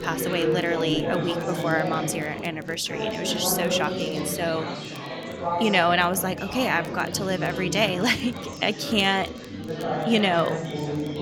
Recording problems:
chatter from many people; loud; throughout; 5 dB below the speech
crackle, like an old record; faint; 30 dB below the speech

